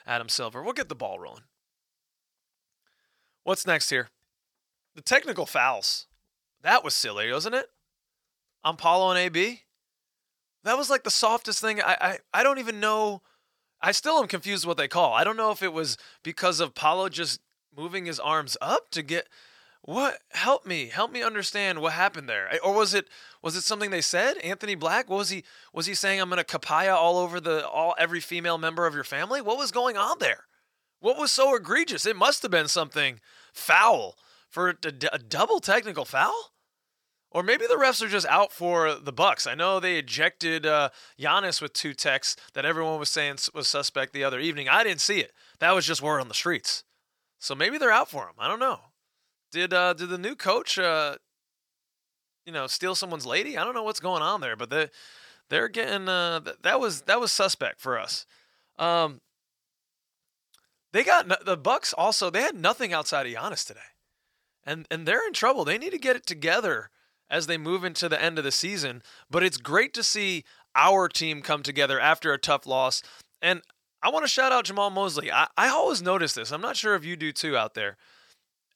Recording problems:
thin; somewhat; fading below 1 kHz

